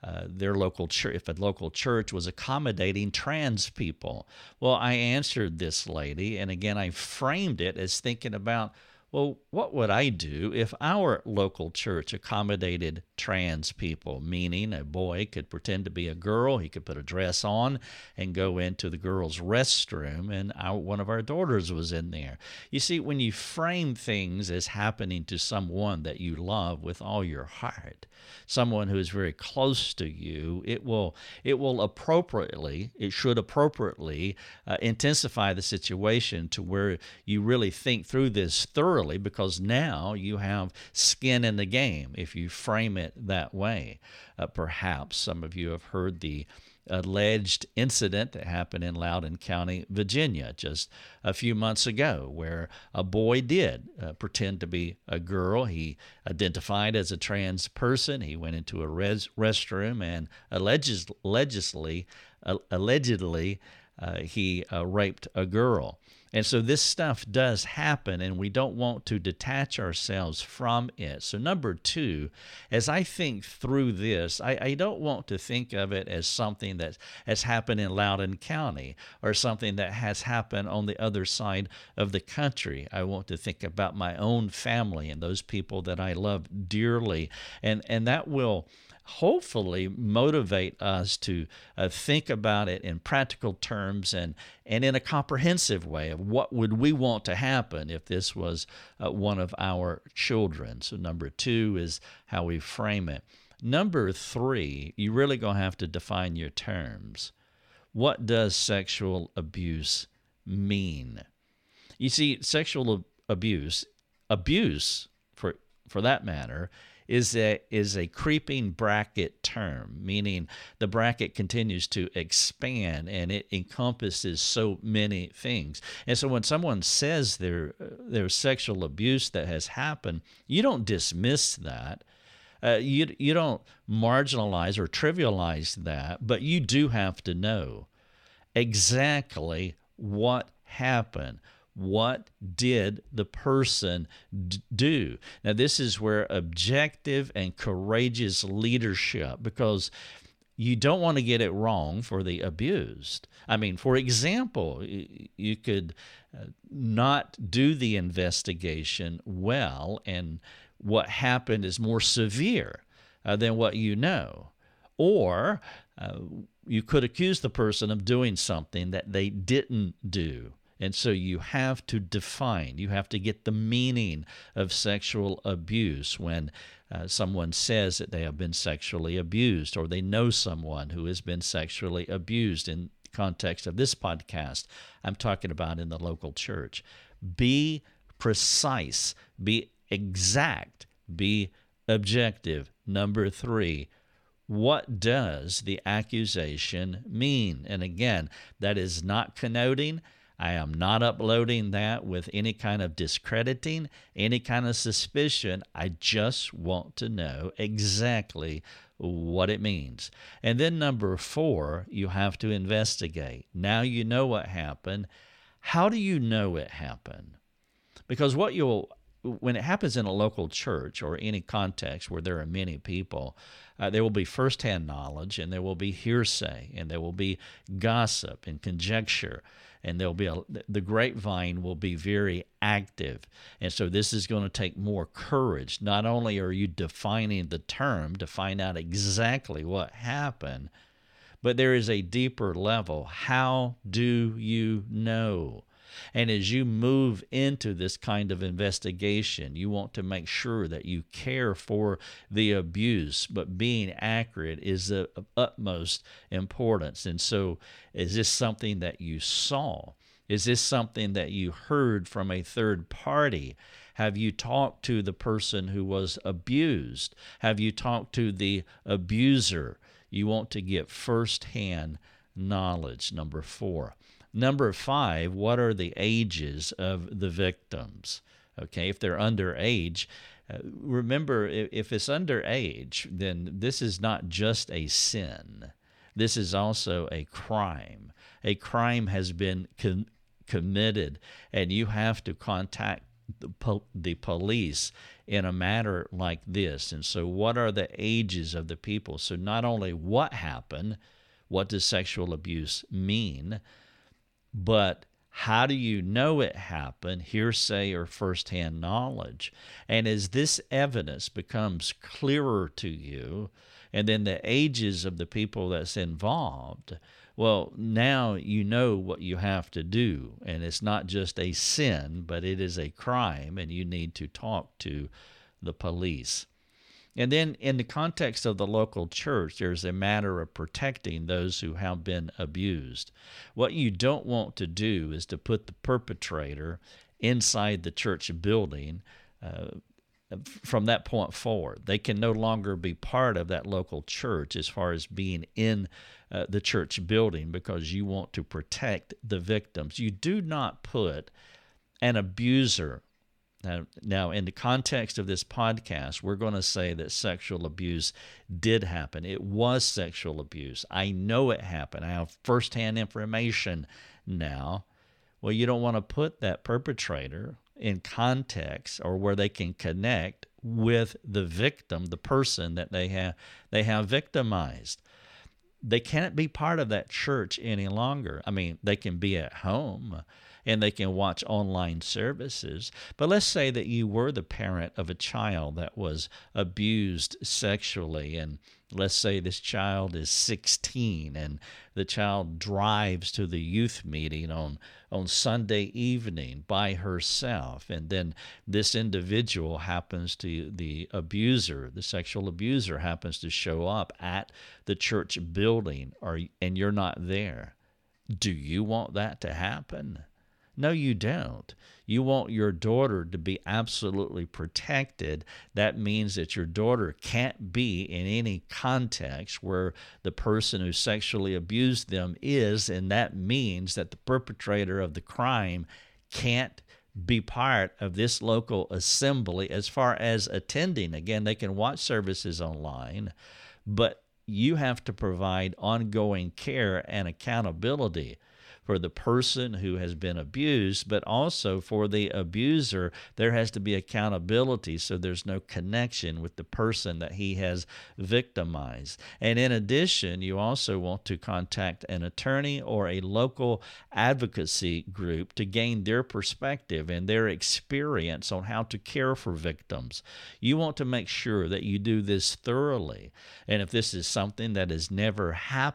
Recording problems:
none

